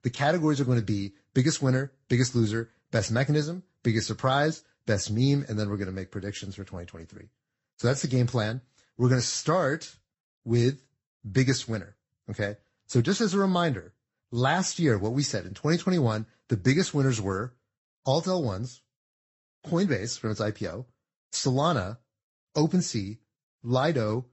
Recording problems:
high frequencies cut off; noticeable; nothing above 8 kHz
garbled, watery; slightly

